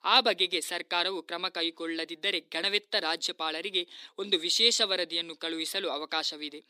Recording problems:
thin; somewhat; fading below 250 Hz

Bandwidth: 15.5 kHz